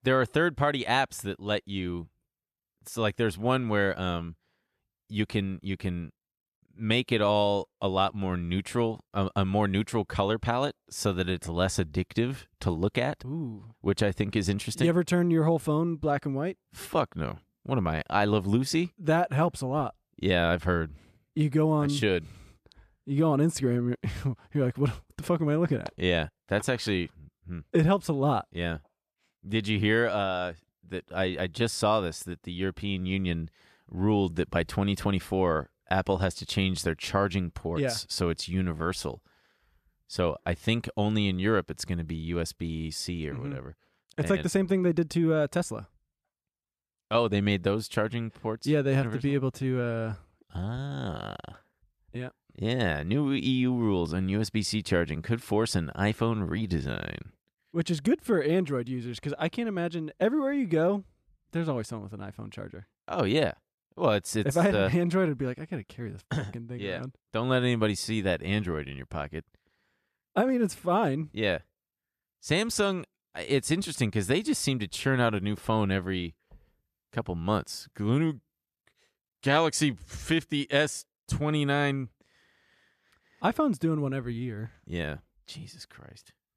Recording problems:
none

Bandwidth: 14.5 kHz